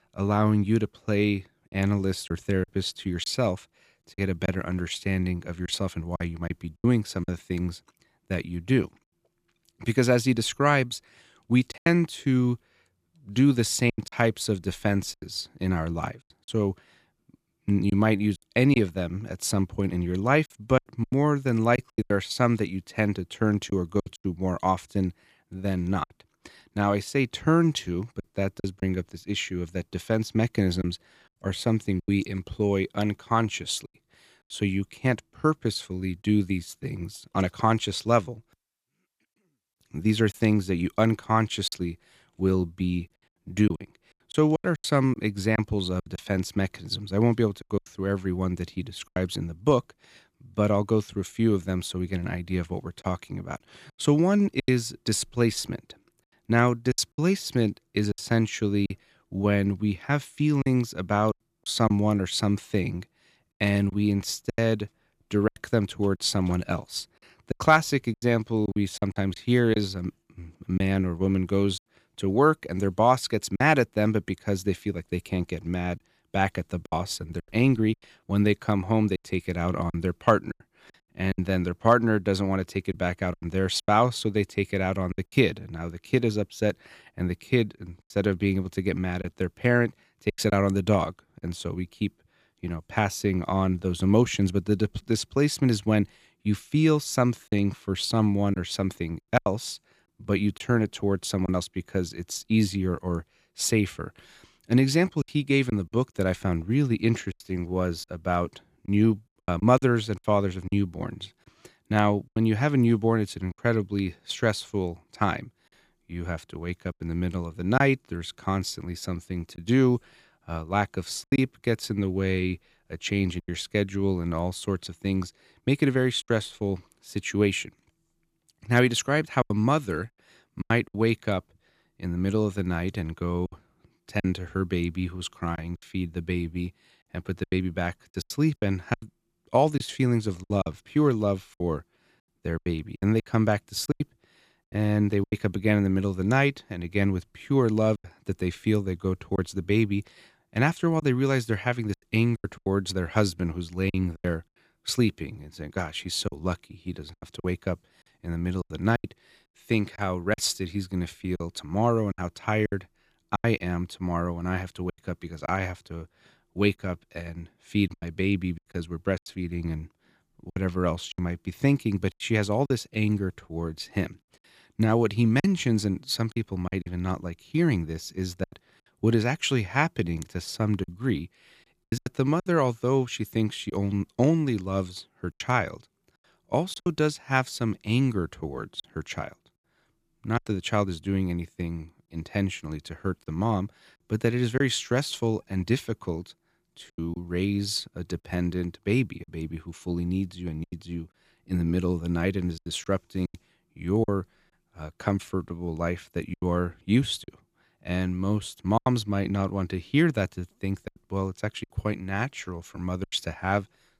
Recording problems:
choppy; very; 6% of the speech affected

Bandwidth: 15 kHz